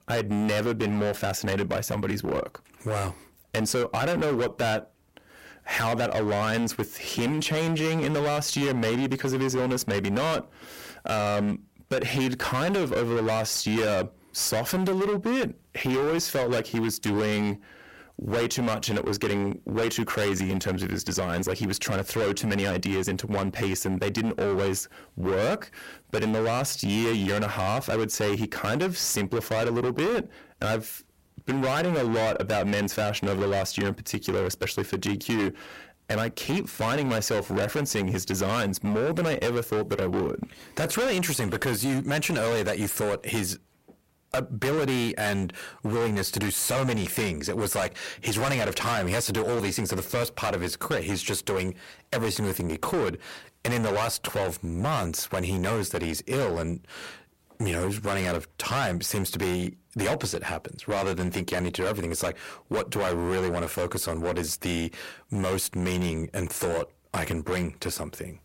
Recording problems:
distortion; heavy; 22% of the sound clipped

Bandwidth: 16 kHz